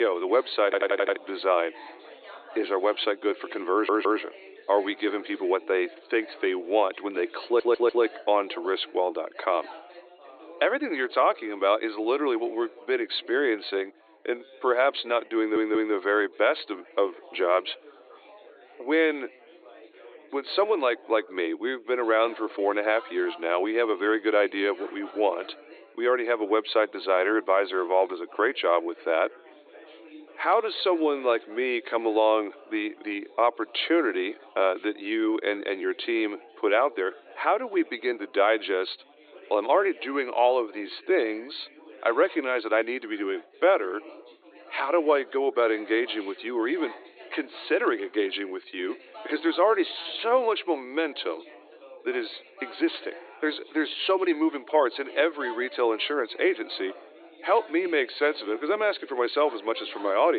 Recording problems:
thin; very; fading below 300 Hz
high frequencies cut off; severe; nothing above 4.5 kHz
background chatter; faint; throughout; 4 voices, 20 dB below the speech
abrupt cut into speech; at the start and the end
audio stuttering; 4 times, first at 0.5 s

